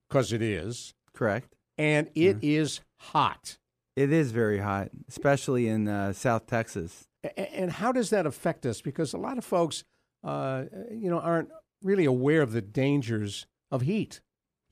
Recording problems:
none

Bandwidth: 14.5 kHz